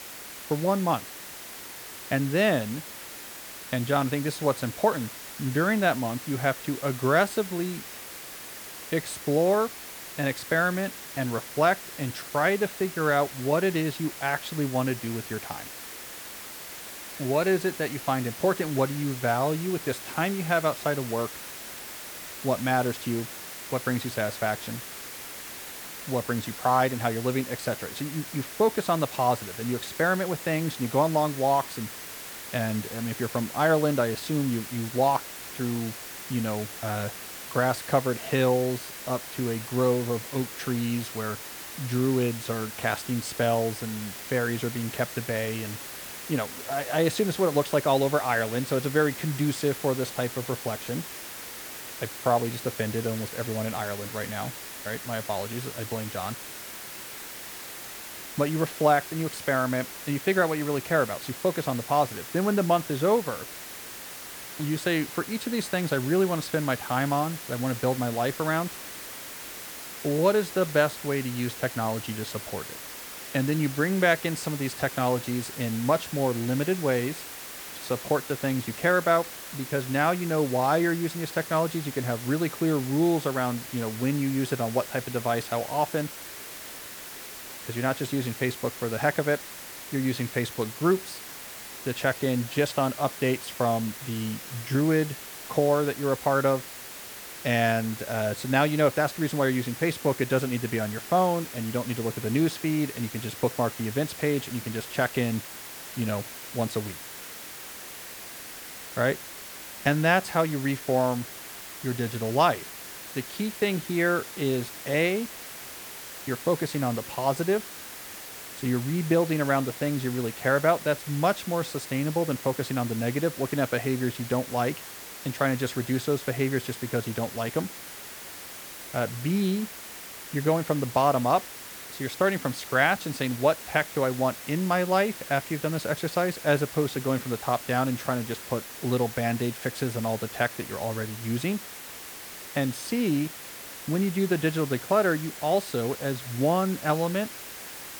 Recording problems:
hiss; noticeable; throughout; 10 dB below the speech

